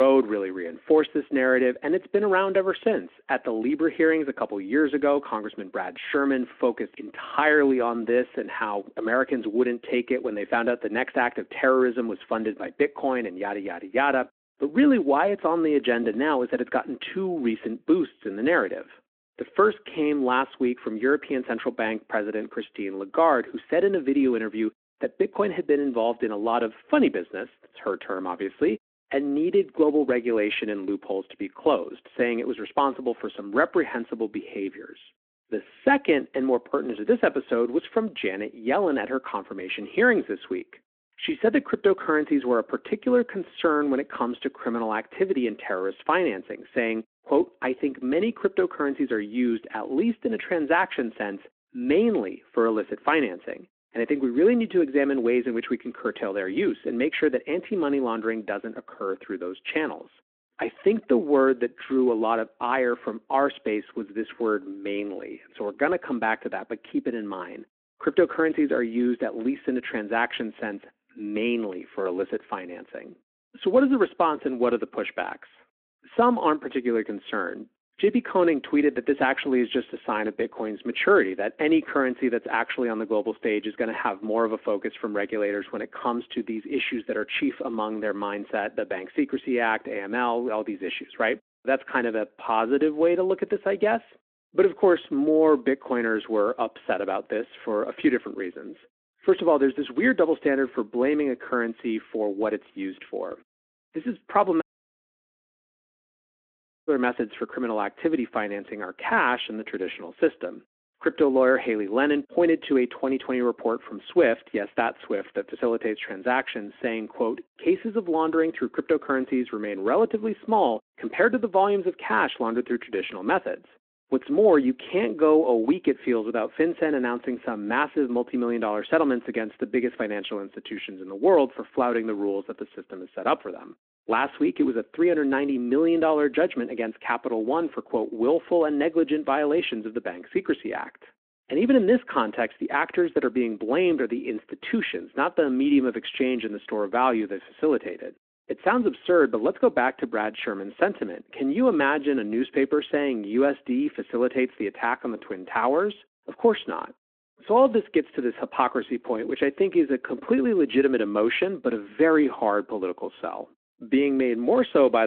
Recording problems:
muffled; very; fading above 4 kHz
phone-call audio
abrupt cut into speech; at the start and the end
audio cutting out; at 1:45 for 2.5 s

